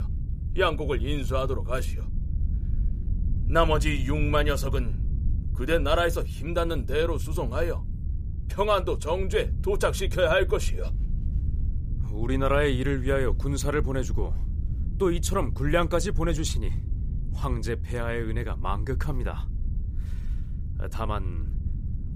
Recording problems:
low rumble; noticeable; throughout; 20 dB below the speech

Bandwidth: 15 kHz